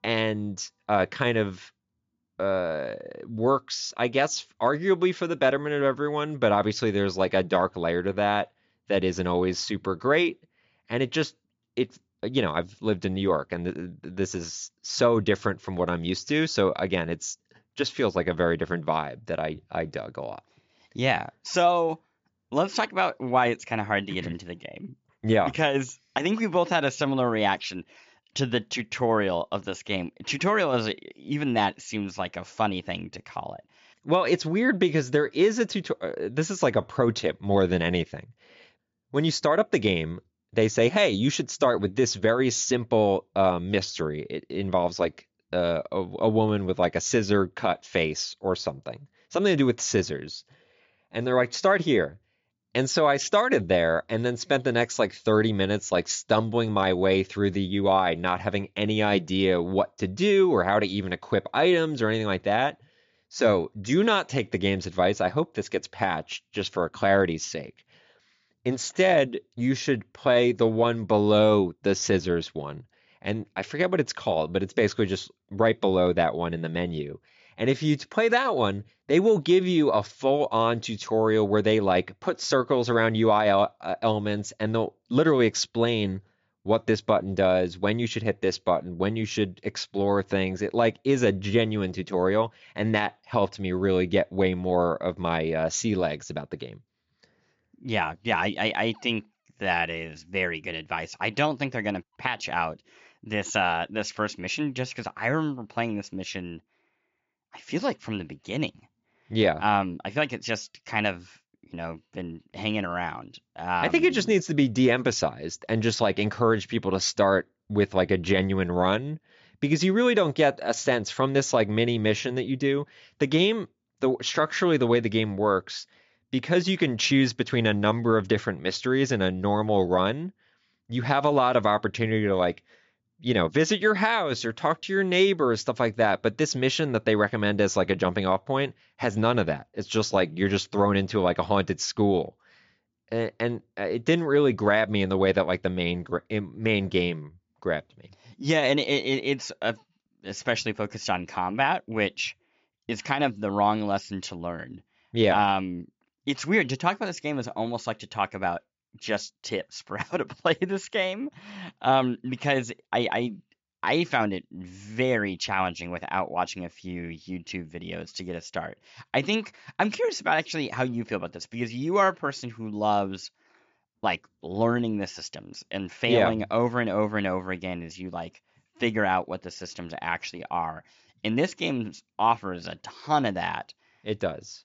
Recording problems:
high frequencies cut off; noticeable; nothing above 7.5 kHz

